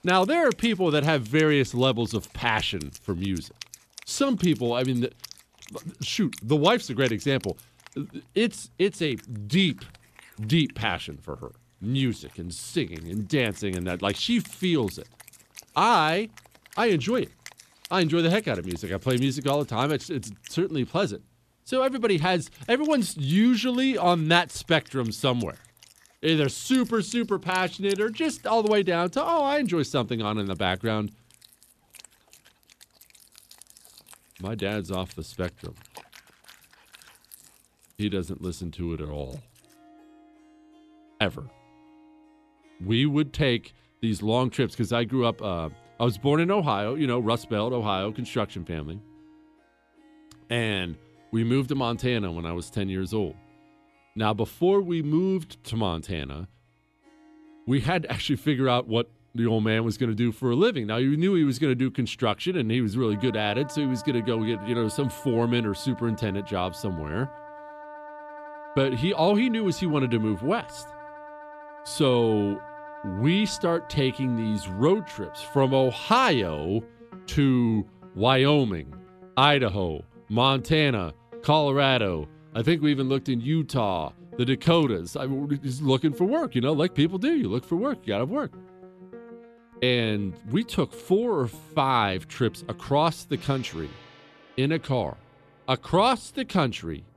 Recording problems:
background music; faint; throughout; 20 dB below the speech

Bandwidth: 14 kHz